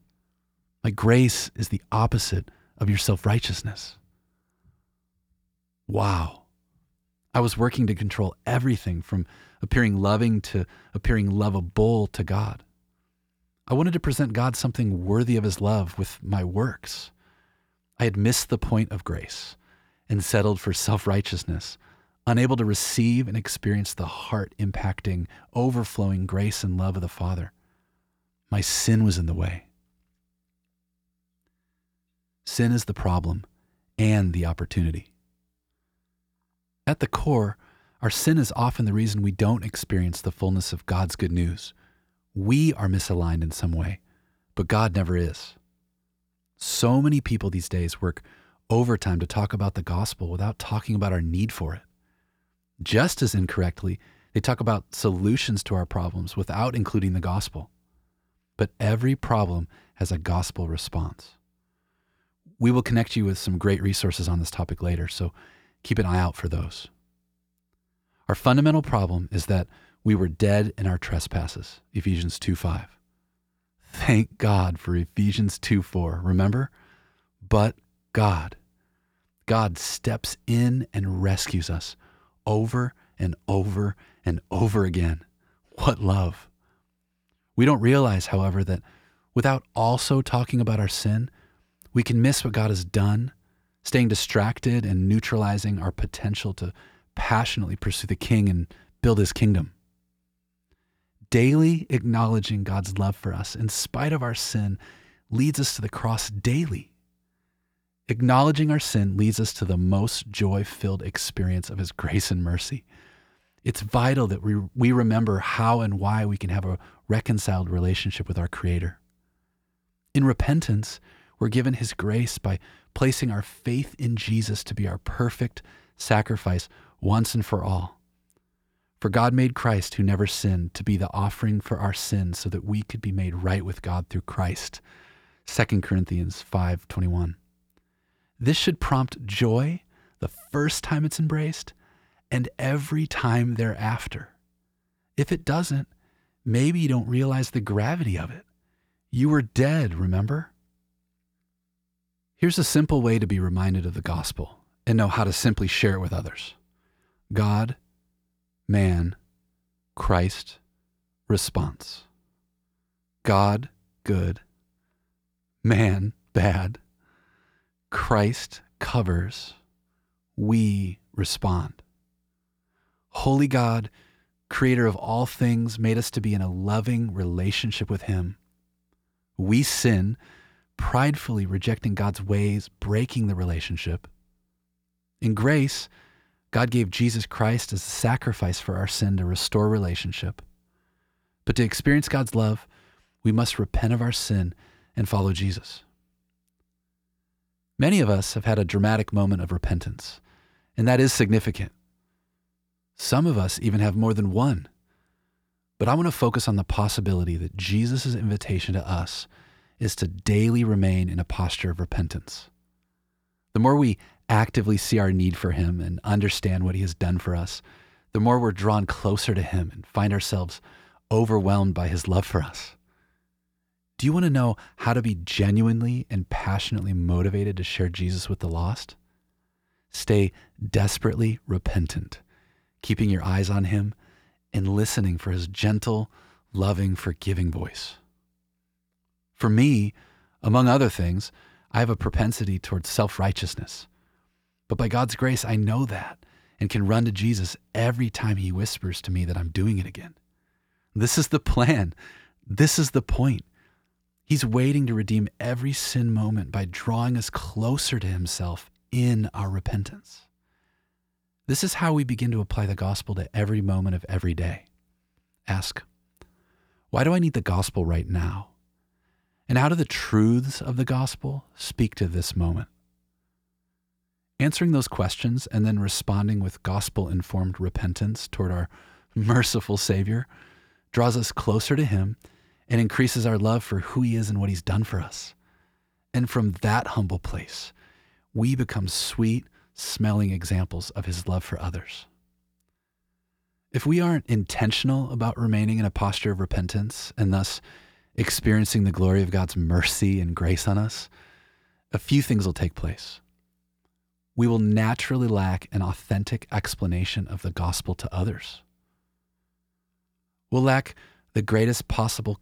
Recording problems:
none

